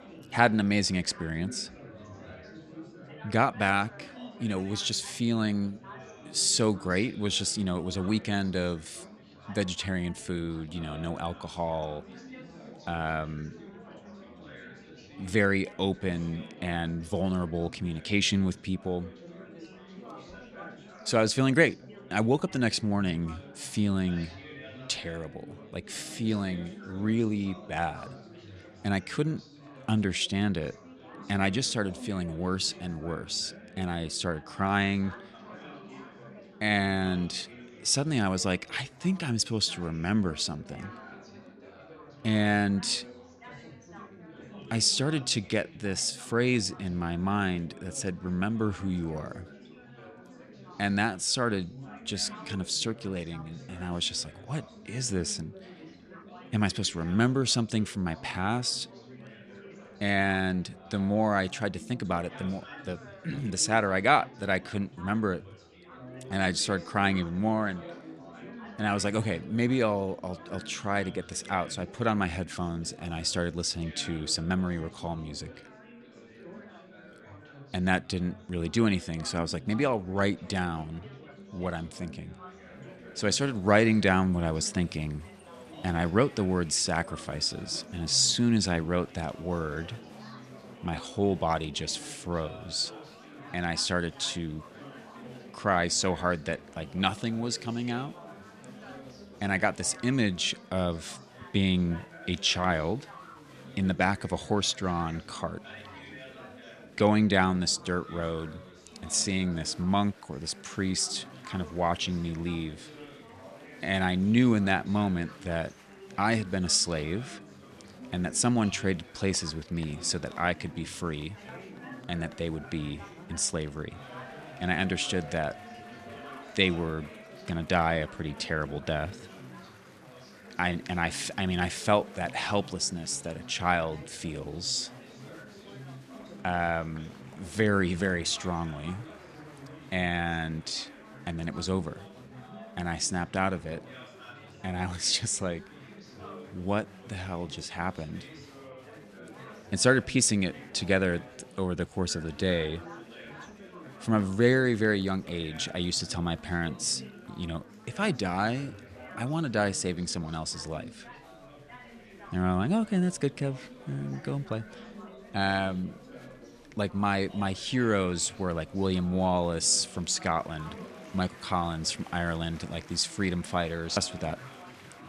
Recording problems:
chatter from many people; noticeable; throughout; 20 dB below the speech

